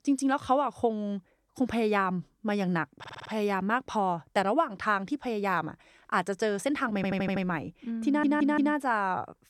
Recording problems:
audio stuttering; at 3 s, at 7 s and at 8 s

